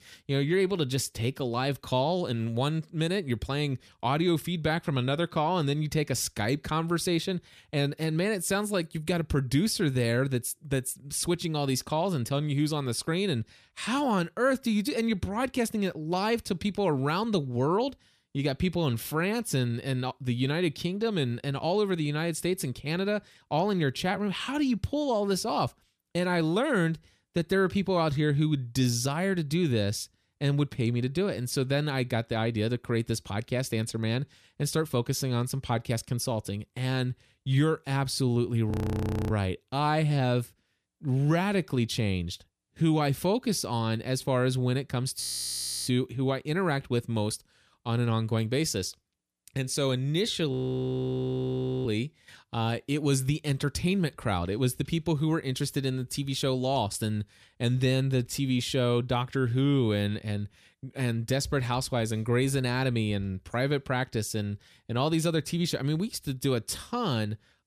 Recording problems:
audio freezing; at 39 s for 0.5 s, at 45 s for 0.5 s and at 51 s for 1.5 s

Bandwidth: 14.5 kHz